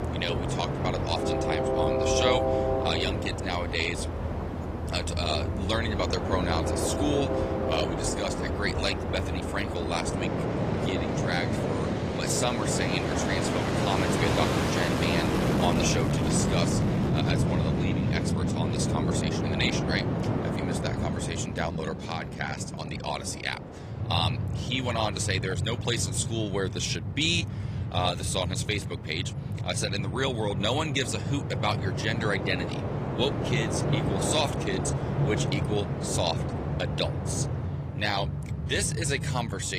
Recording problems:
garbled, watery; slightly; nothing above 14.5 kHz
train or aircraft noise; very loud; throughout; 1 dB above the speech
abrupt cut into speech; at the end

